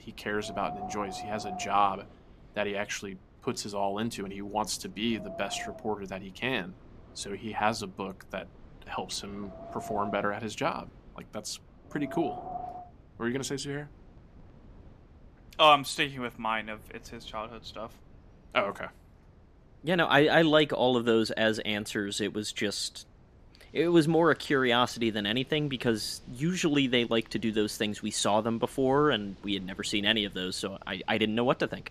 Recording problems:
wind in the background; noticeable; throughout; 20 dB below the speech

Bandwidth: 14 kHz